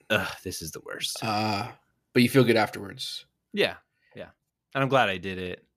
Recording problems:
none

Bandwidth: 14.5 kHz